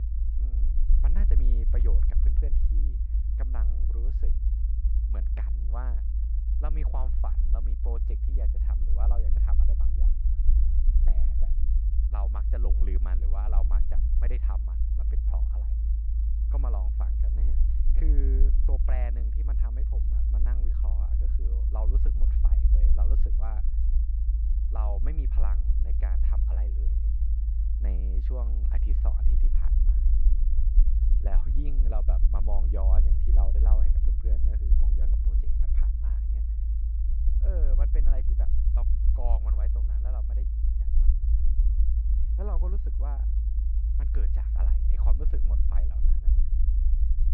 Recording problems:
muffled; very; fading above 1.5 kHz
low rumble; loud; throughout; 2 dB below the speech

